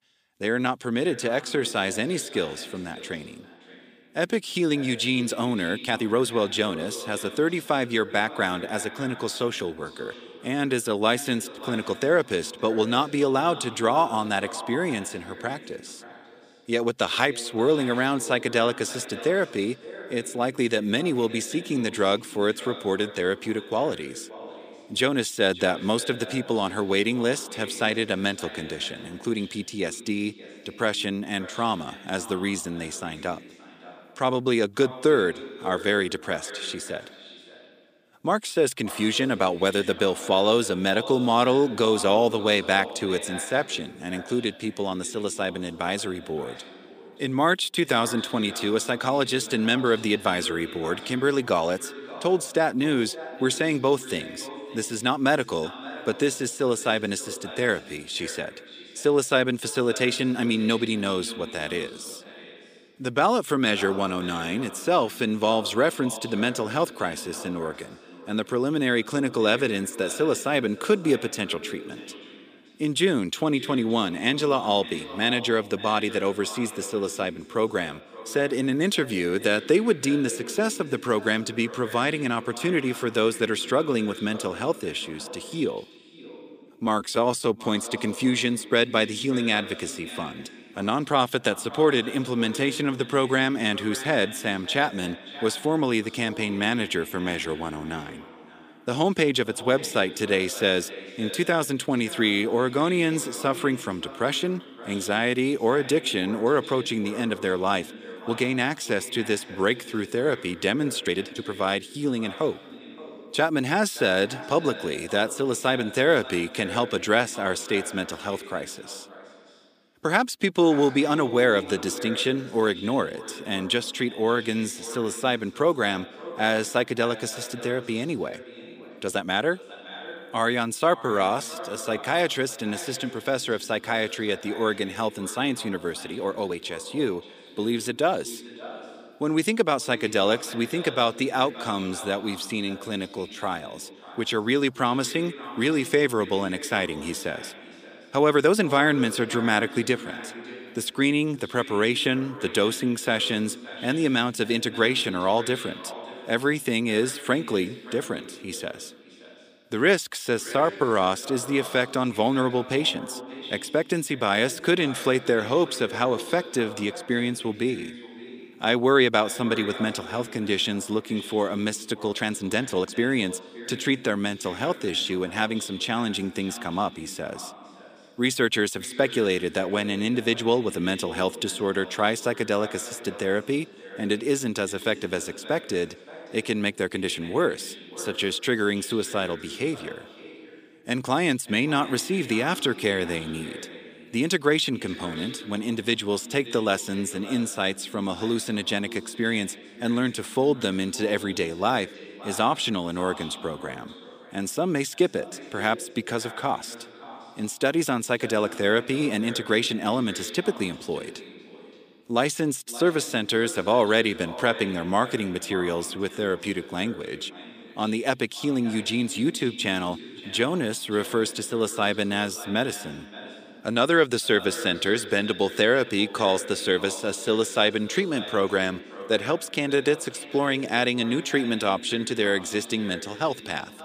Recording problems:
echo of what is said; noticeable; throughout; 570 ms later, 15 dB below the speech
thin; somewhat; fading below 300 Hz
uneven, jittery; strongly; from 6 s to 2:55

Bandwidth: 15 kHz